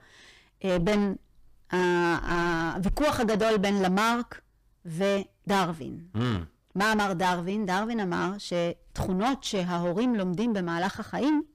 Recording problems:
distortion; heavy; 6 dB below the speech

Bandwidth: 15 kHz